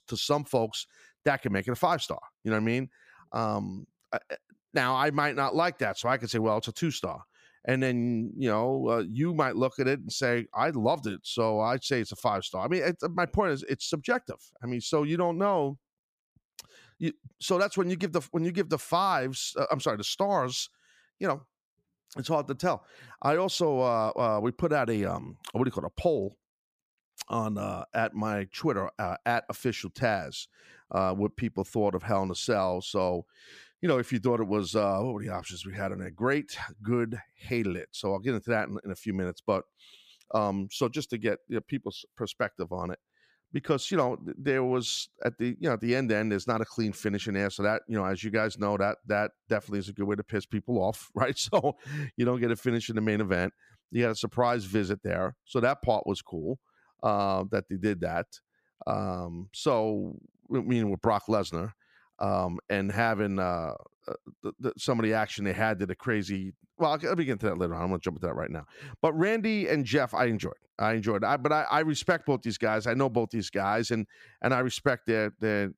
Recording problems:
none

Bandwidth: 15 kHz